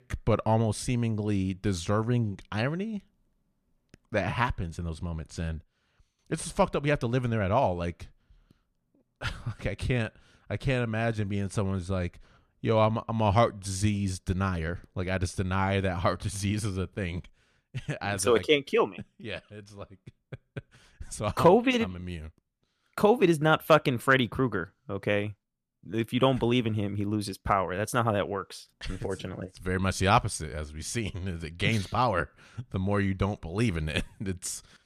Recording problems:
none

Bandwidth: 14.5 kHz